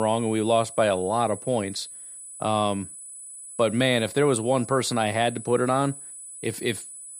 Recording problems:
high-pitched whine; noticeable; throughout; 10 kHz, 15 dB below the speech
abrupt cut into speech; at the start

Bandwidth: 14.5 kHz